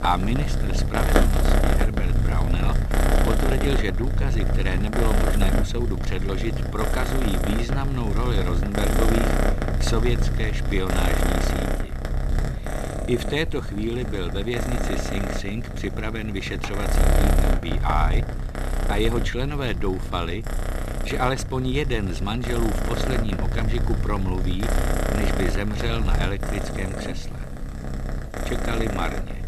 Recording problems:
animal sounds; very loud; throughout; 3 dB above the speech
low rumble; faint; throughout; 25 dB below the speech

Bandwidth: 13.5 kHz